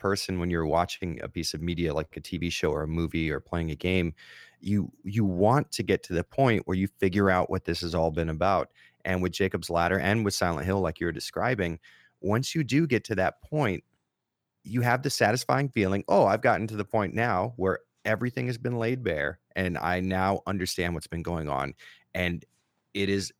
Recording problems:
none

